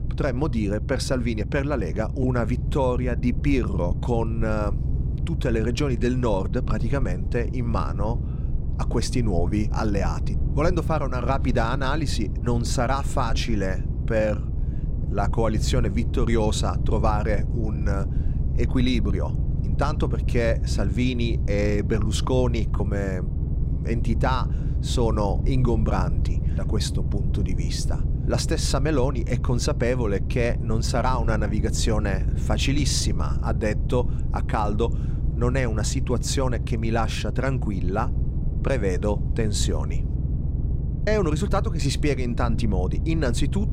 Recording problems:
low rumble; noticeable; throughout; 10 dB below the speech

